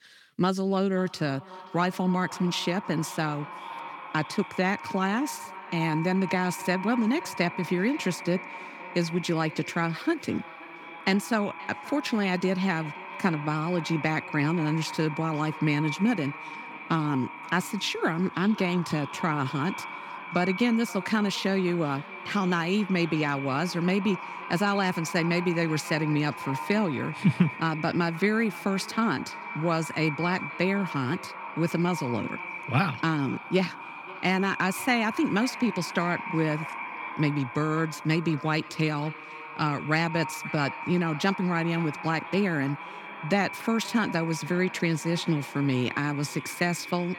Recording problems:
echo of what is said; strong; throughout; 530 ms later, 10 dB below the speech

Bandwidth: 17.5 kHz